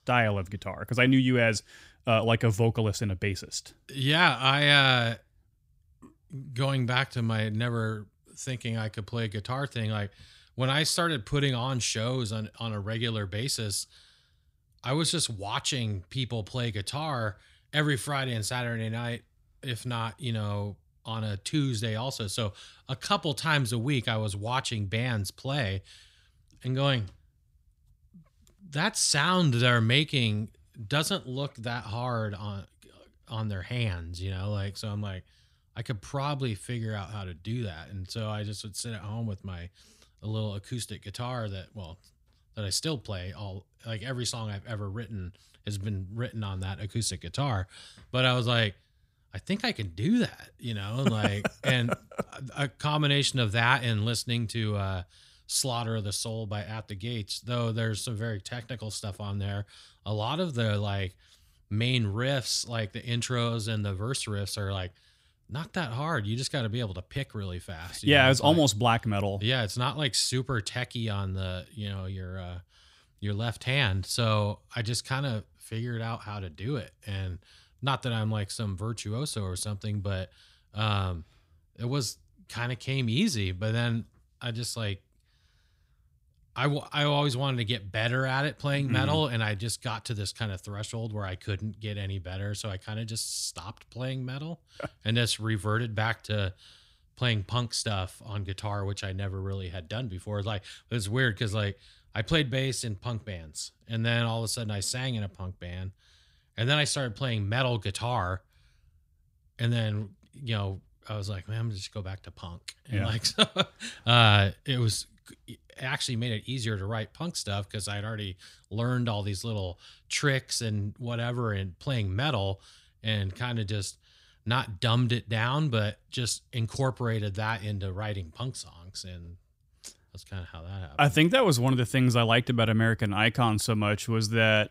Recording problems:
none

